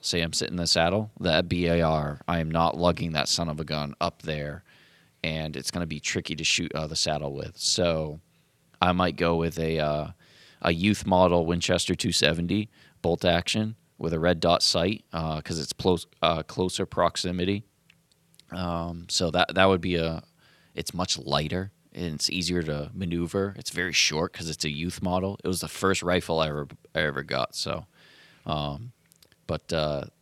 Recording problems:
none

